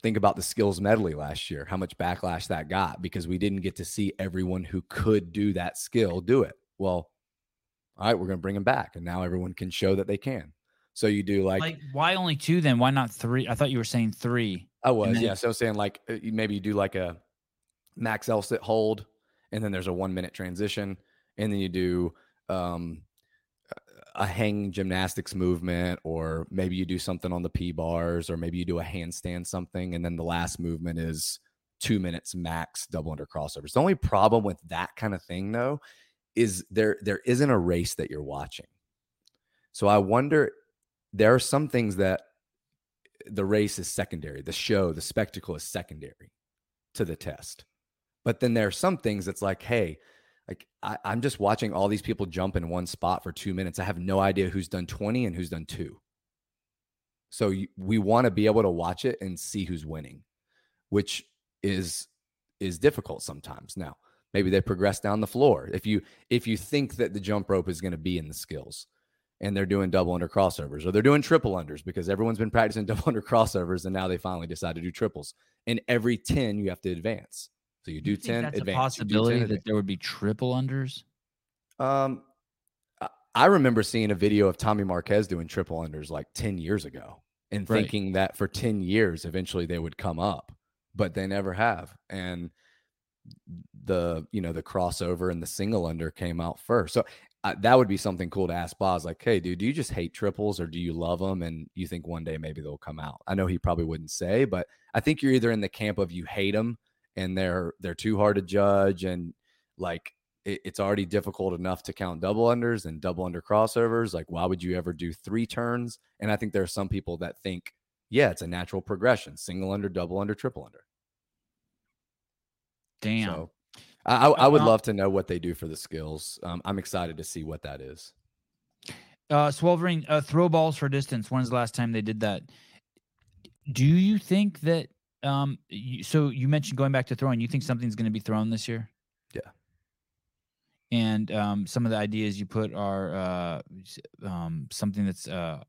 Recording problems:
none

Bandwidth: 16 kHz